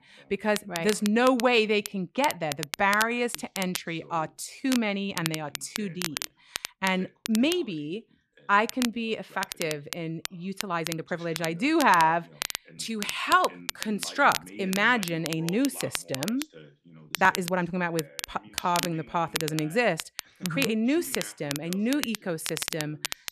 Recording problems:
crackle, like an old record; loud; 8 dB below the speech
voice in the background; faint; throughout; 25 dB below the speech
uneven, jittery; strongly; from 1.5 to 23 s

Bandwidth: 14 kHz